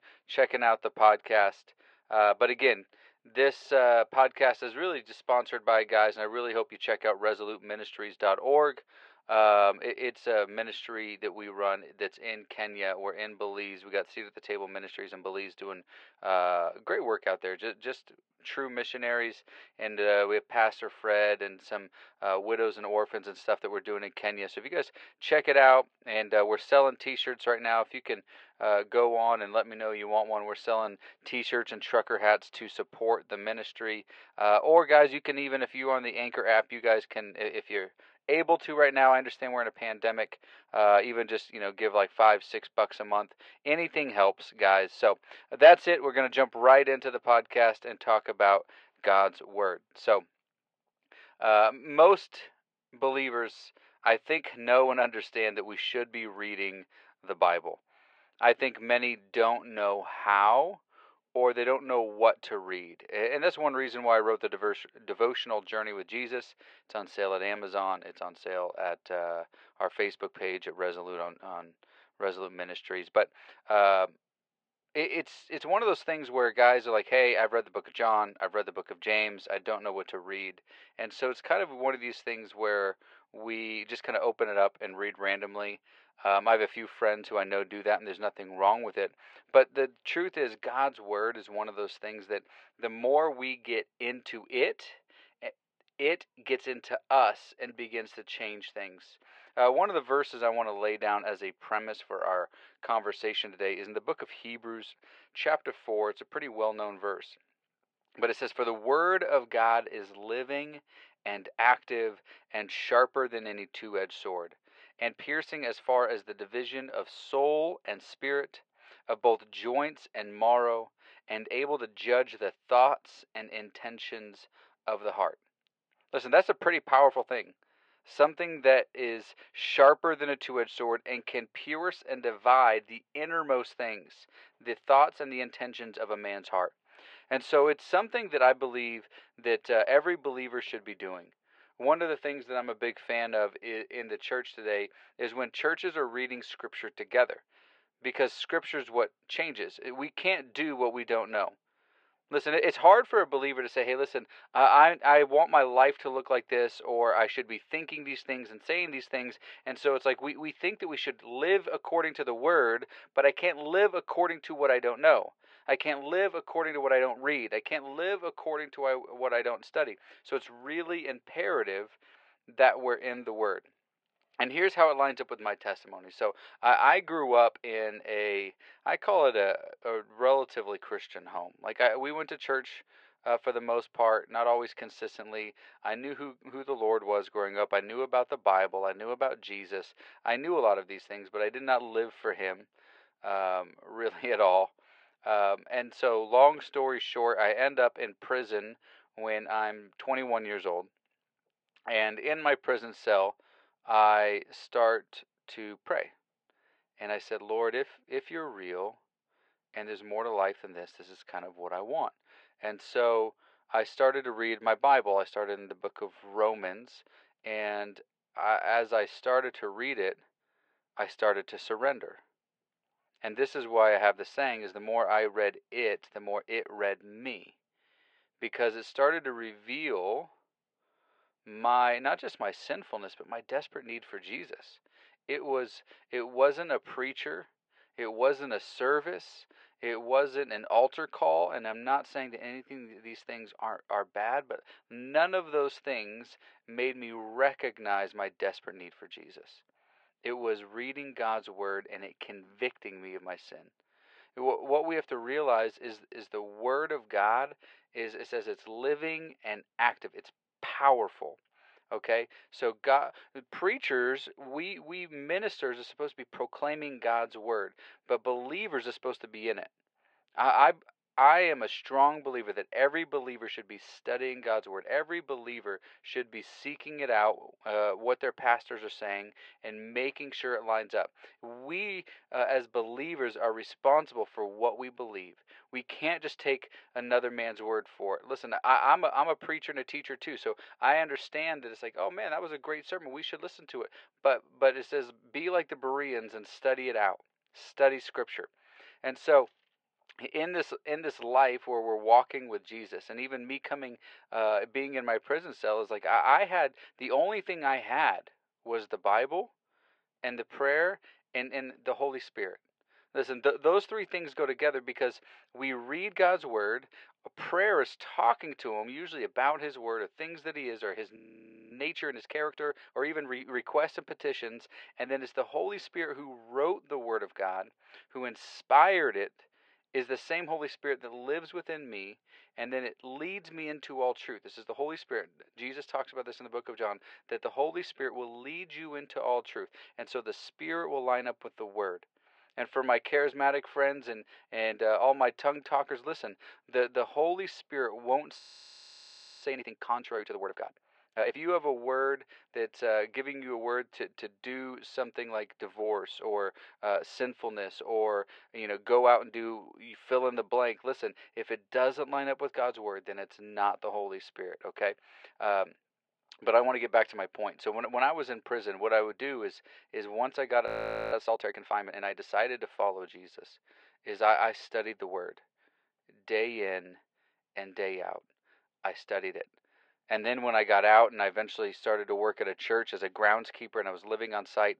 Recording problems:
thin; very; fading below 450 Hz
muffled; slightly; fading above 3 kHz
audio freezing; at 5:21 for 0.5 s, at 5:48 for 1 s and at 6:11

